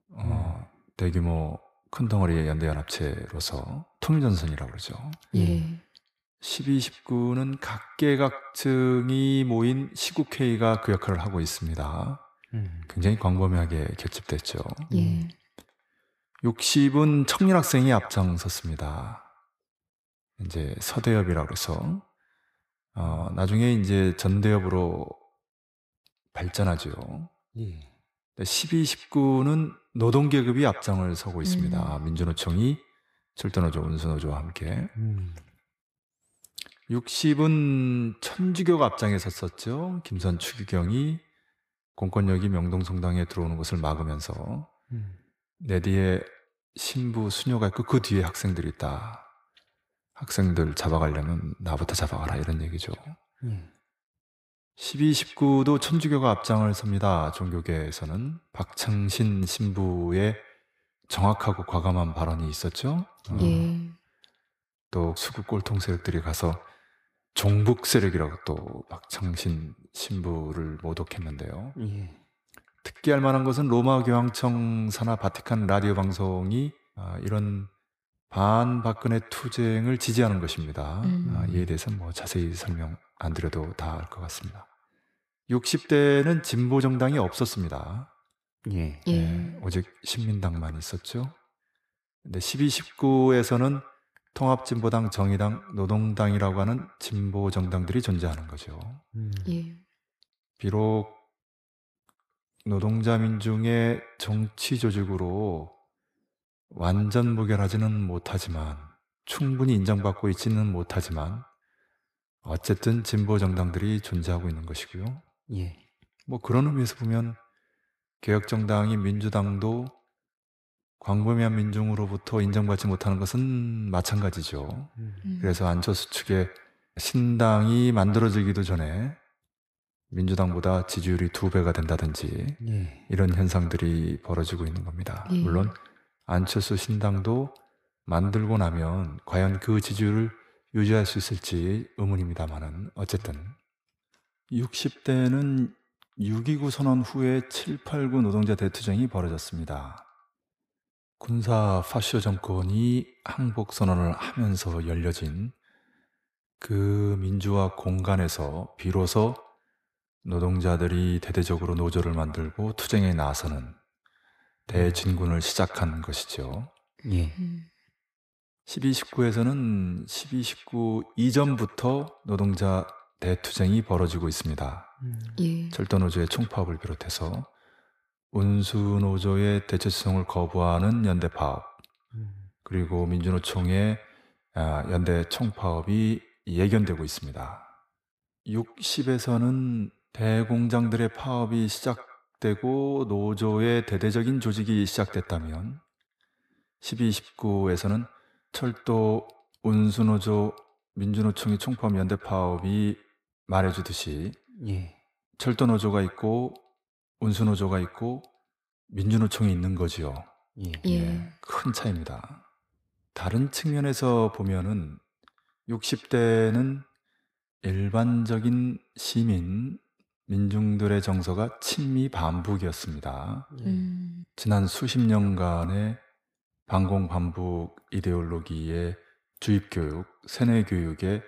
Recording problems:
echo of what is said; faint; throughout; 100 ms later, 20 dB below the speech

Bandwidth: 15 kHz